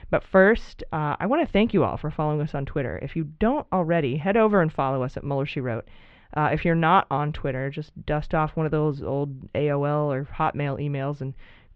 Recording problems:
muffled; very; fading above 3.5 kHz

